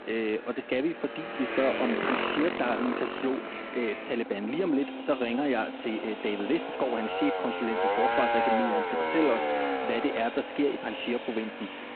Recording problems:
phone-call audio; poor line
echo of what is said; noticeable; from 5 s on; 320 ms later, 15 dB below the speech
traffic noise; loud; throughout; 1 dB below the speech

